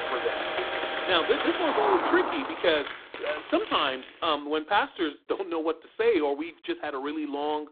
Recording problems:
phone-call audio; poor line; nothing above 3.5 kHz
traffic noise; loud; until 2.5 s; 2 dB below the speech
footsteps; noticeable; until 4 s; peak 7 dB below the speech

